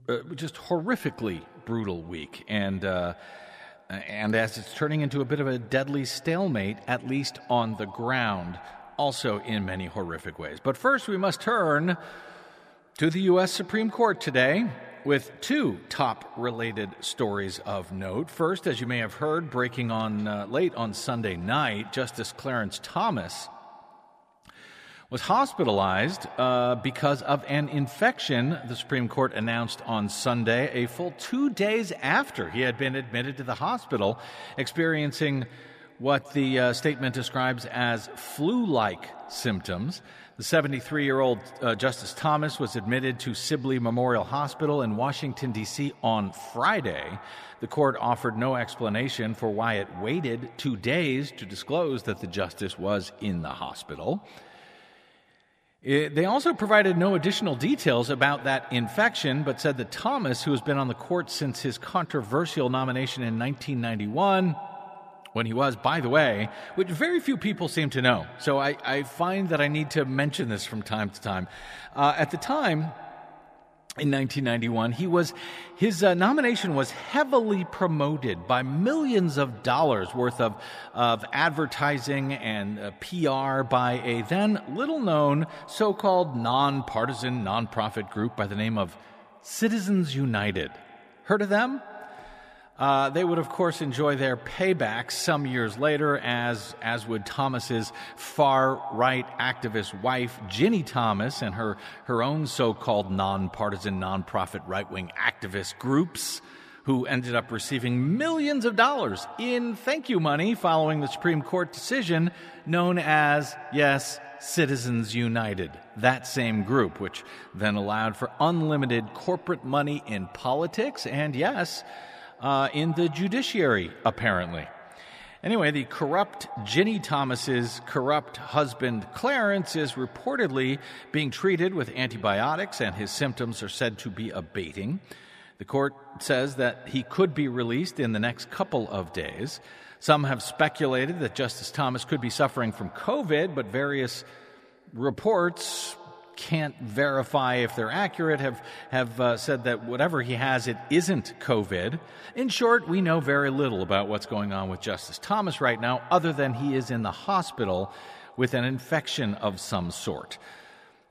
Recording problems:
echo of what is said; faint; throughout; 150 ms later, 20 dB below the speech

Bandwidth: 14.5 kHz